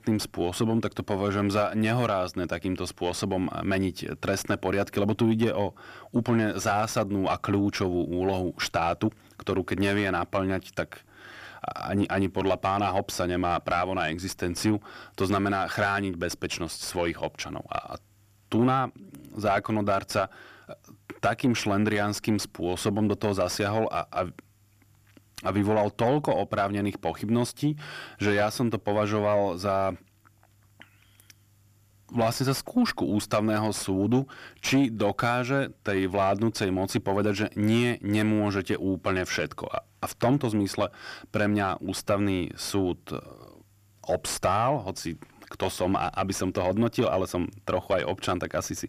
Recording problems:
distortion; slight; 10 dB below the speech

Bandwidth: 14.5 kHz